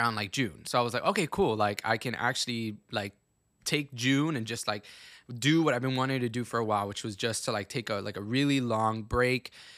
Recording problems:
abrupt cut into speech; at the start

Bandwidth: 15 kHz